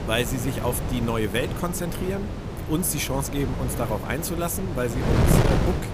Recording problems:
wind noise on the microphone; heavy; 3 dB below the speech

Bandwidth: 15 kHz